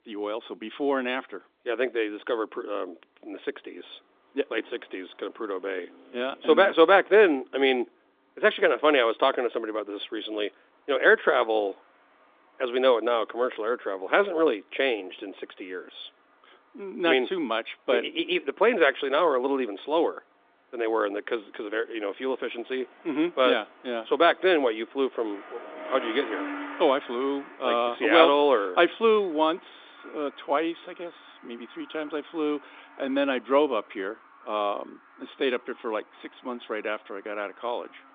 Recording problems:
phone-call audio
traffic noise; noticeable; throughout; 20 dB below the speech

